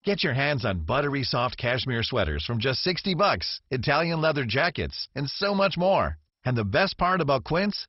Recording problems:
garbled, watery; badly; nothing above 5.5 kHz

